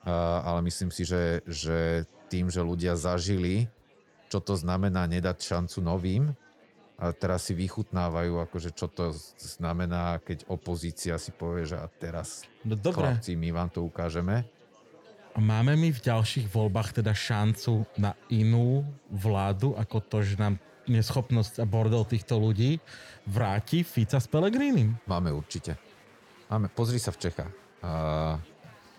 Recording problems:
murmuring crowd; faint; throughout; 25 dB below the speech

